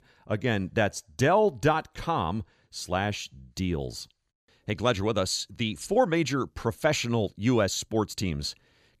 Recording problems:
none

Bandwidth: 14.5 kHz